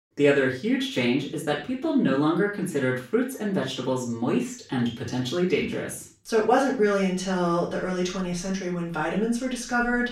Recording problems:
off-mic speech; far
room echo; noticeable; dies away in 0.3 s

